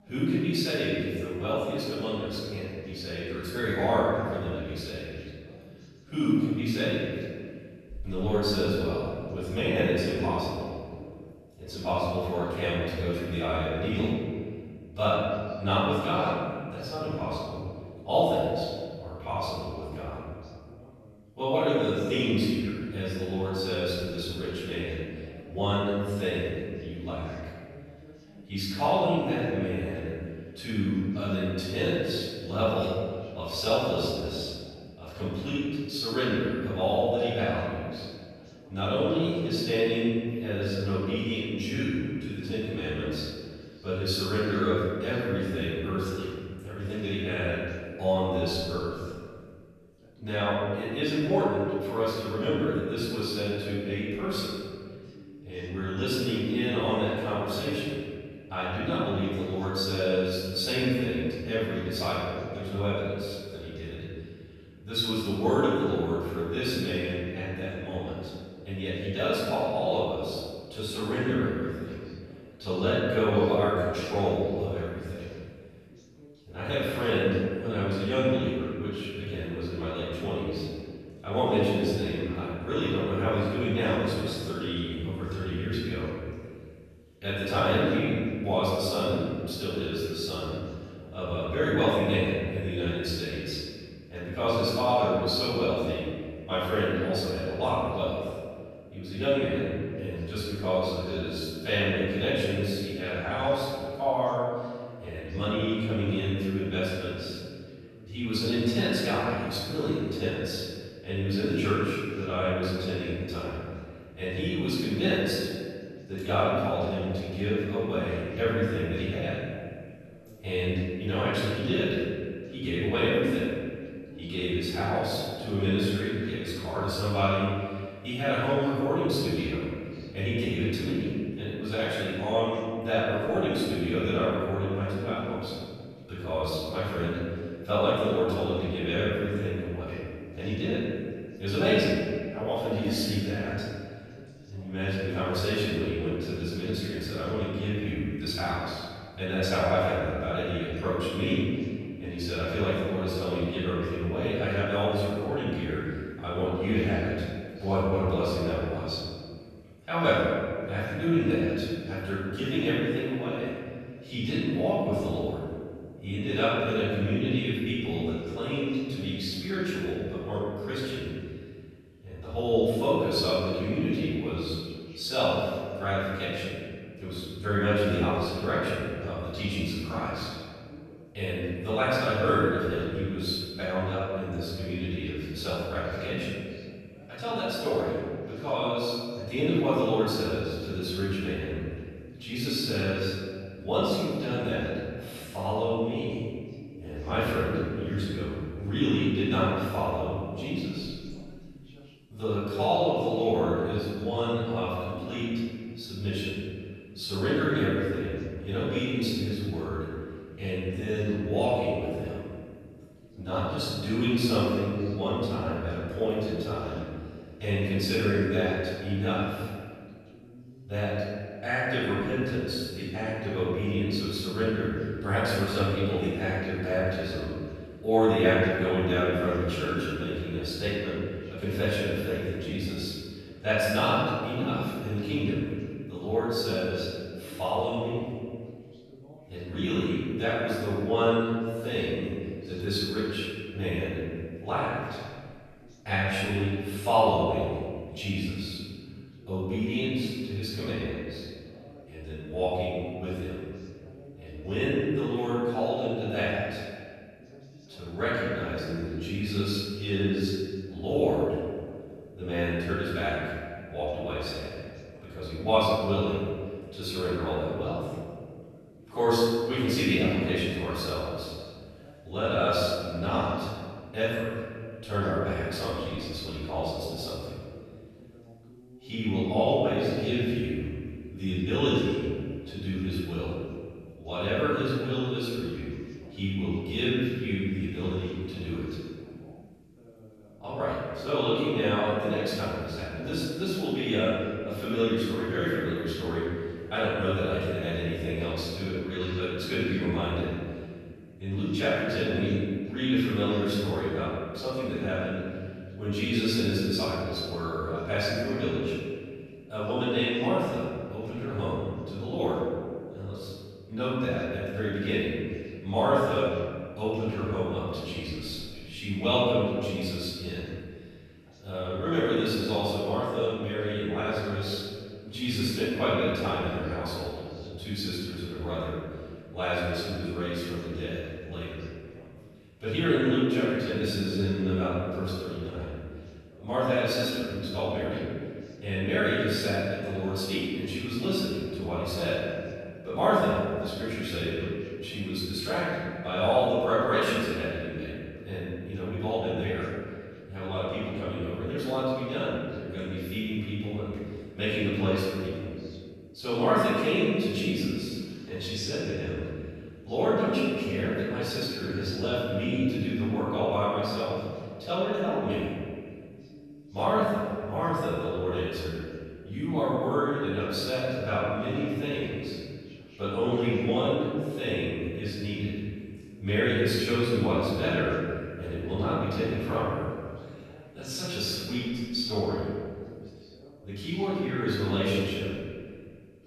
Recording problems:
room echo; strong; dies away in 1.8 s
off-mic speech; far
voice in the background; faint; throughout; 25 dB below the speech

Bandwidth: 13.5 kHz